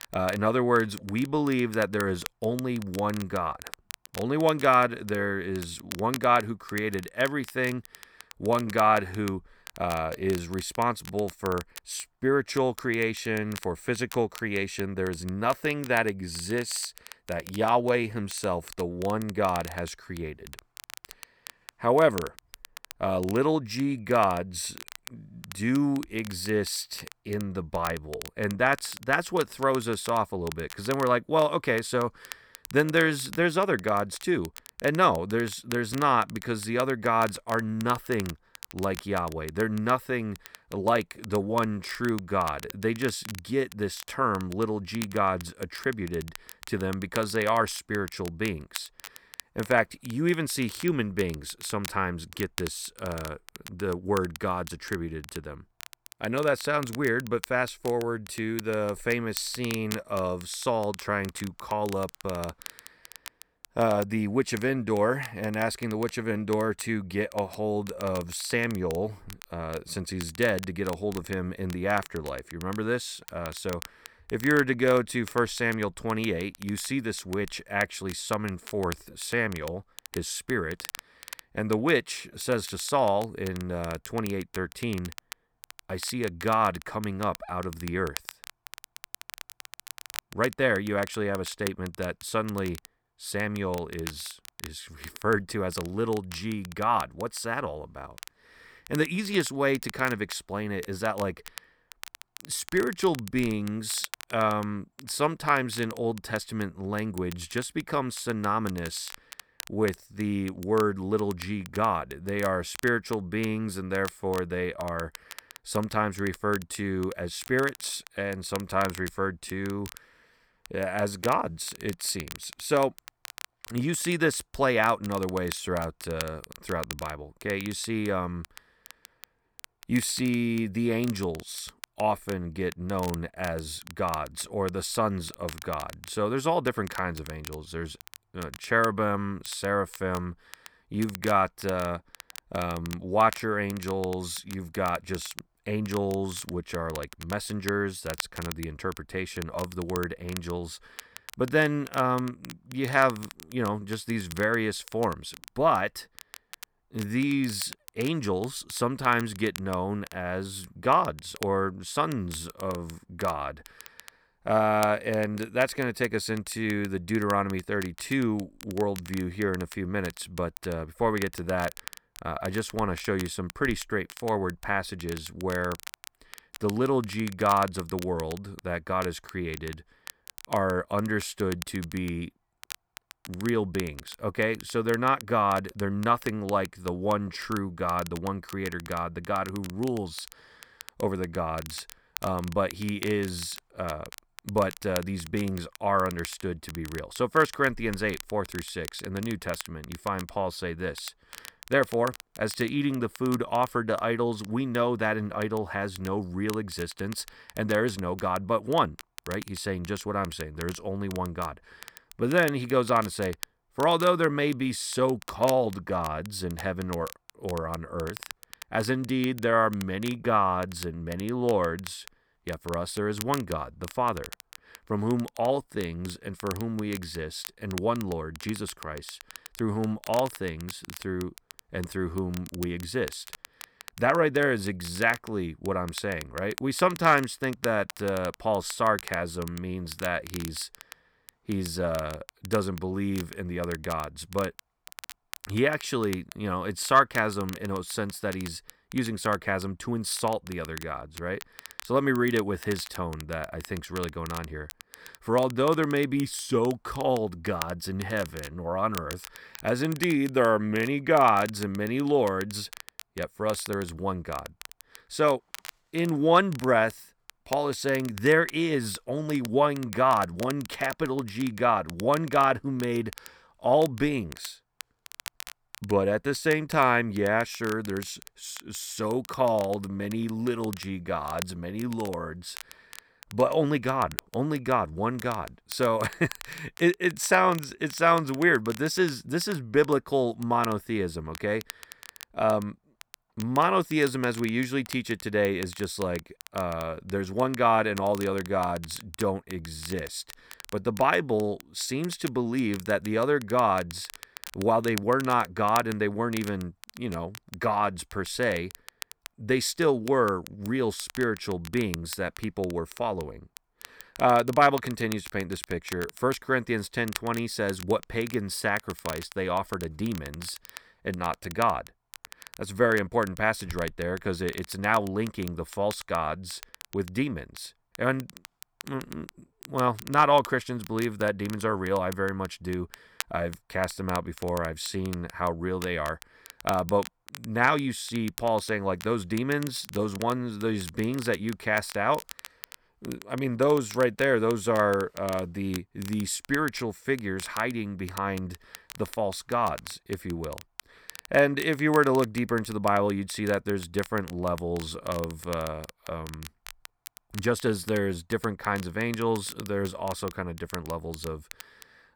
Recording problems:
crackle, like an old record; noticeable; 15 dB below the speech

